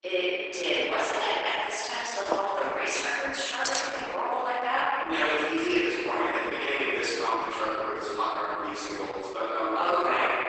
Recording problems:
room echo; strong; dies away in 2.1 s
off-mic speech; far
garbled, watery; badly; nothing above 8 kHz
thin; somewhat; fading below 300 Hz
door banging; noticeable; at 2.5 s; peak 7 dB below the speech
jangling keys; noticeable; at 3.5 s; peak 2 dB below the speech

